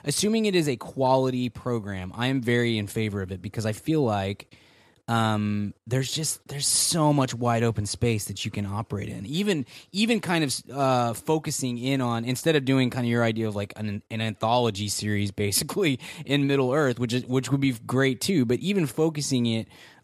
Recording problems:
none

